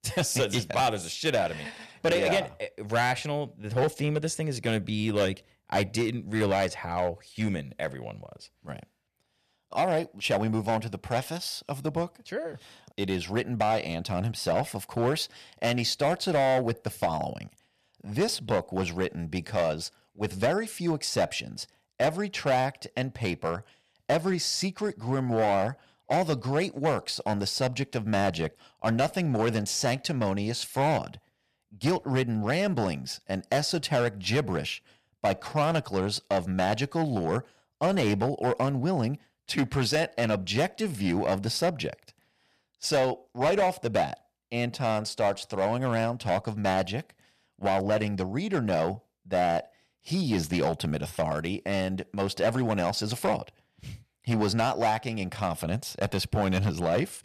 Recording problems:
distortion; slight; 6% of the sound clipped

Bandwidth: 14.5 kHz